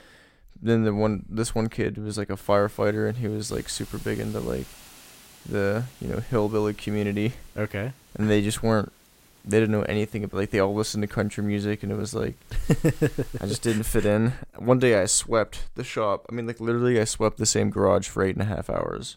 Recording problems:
hiss; faint; from 2.5 to 14 s; 25 dB below the speech

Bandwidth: 16 kHz